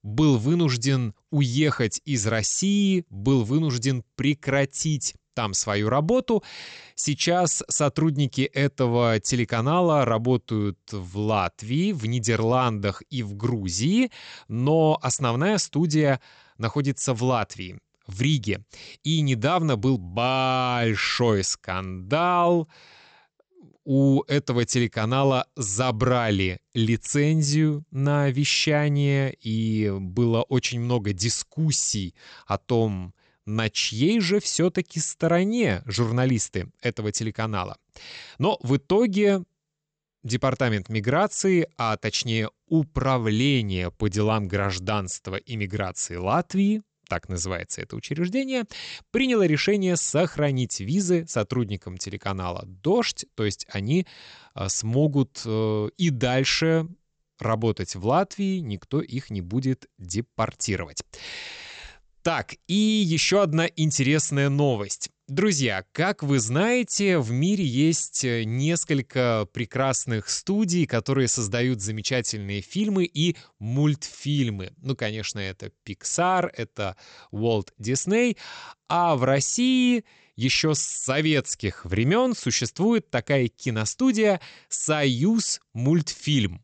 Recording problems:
high frequencies cut off; noticeable; nothing above 8 kHz

